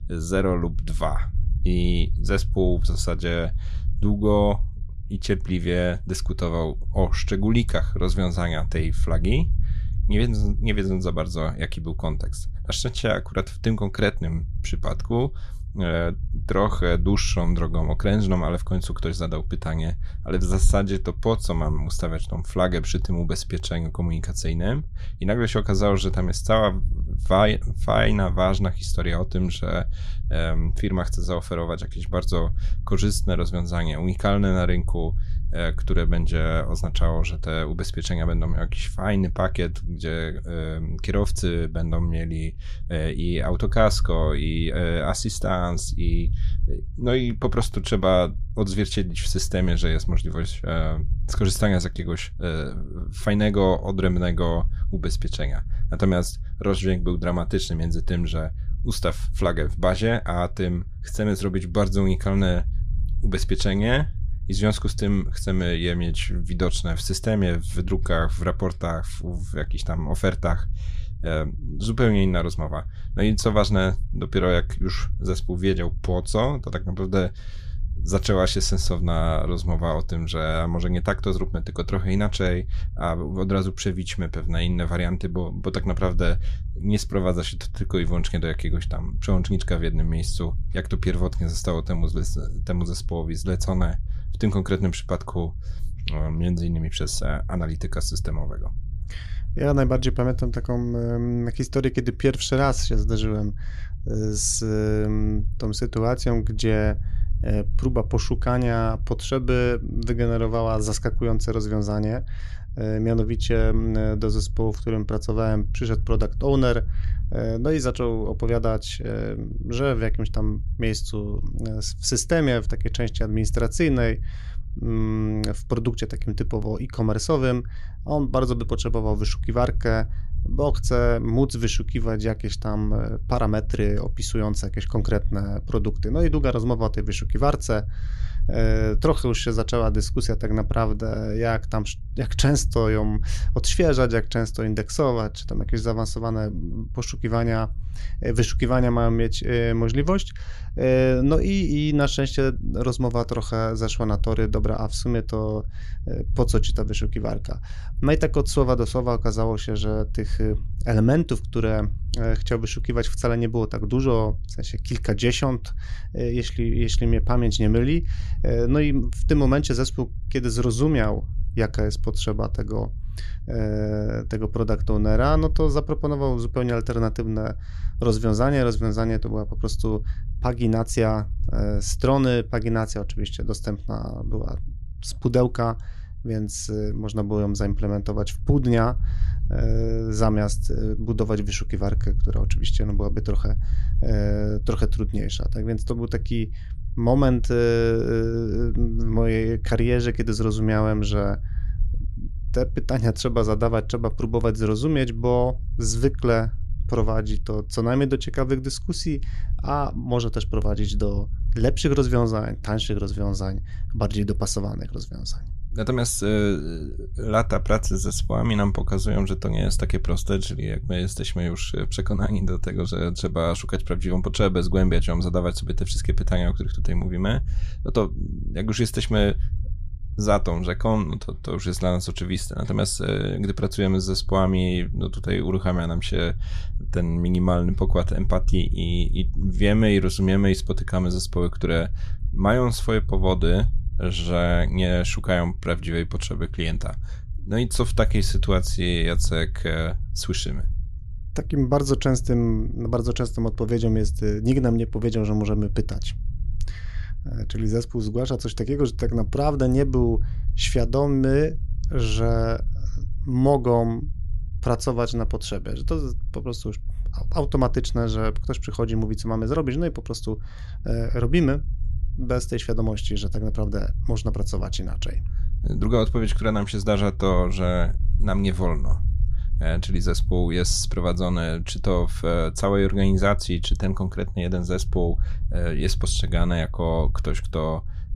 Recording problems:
low rumble; faint; throughout; 20 dB below the speech

